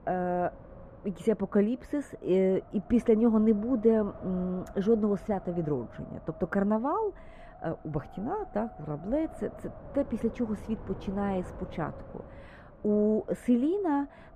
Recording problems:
muffled; very; fading above 2.5 kHz
wind noise on the microphone; occasional gusts; 15 dB below the speech

